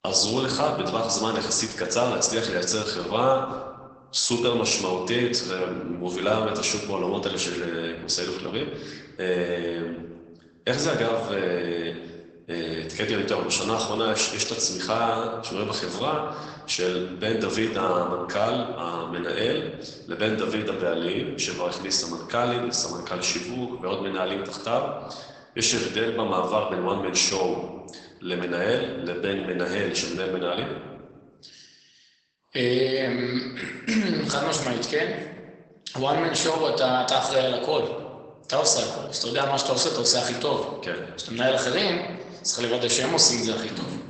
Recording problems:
garbled, watery; badly; nothing above 8 kHz
room echo; slight; dies away in 1 s
off-mic speech; somewhat distant
thin; very slightly; fading below 600 Hz

